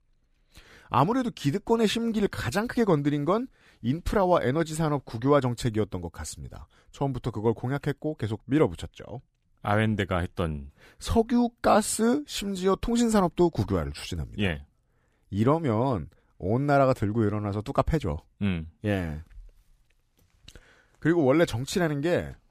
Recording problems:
none

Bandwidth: 15 kHz